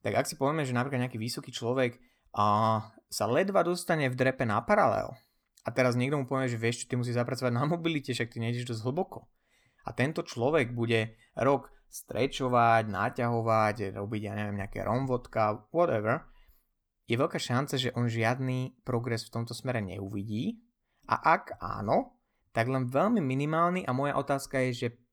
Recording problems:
none

